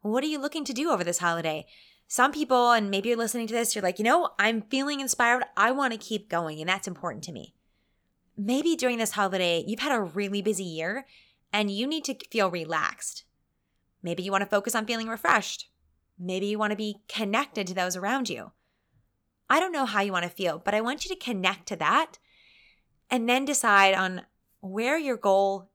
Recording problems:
none

